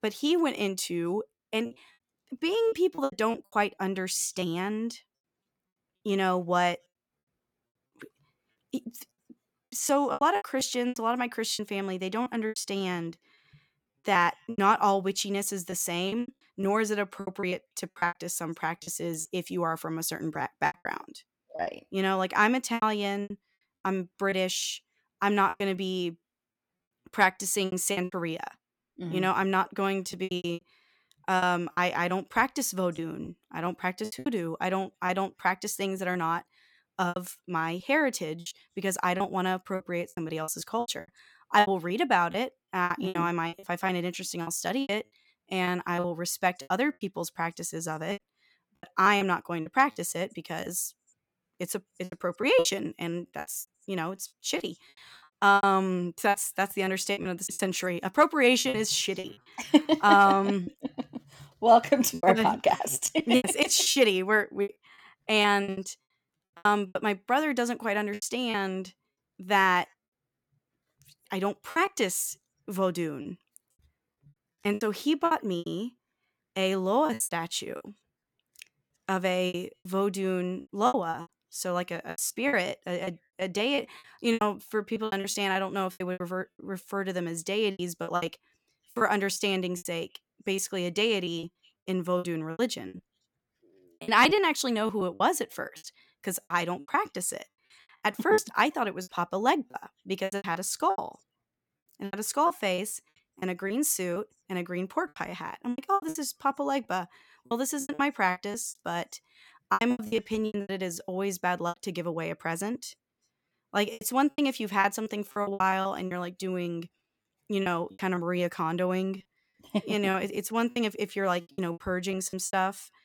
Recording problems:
choppy; very; 13% of the speech affected

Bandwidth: 17.5 kHz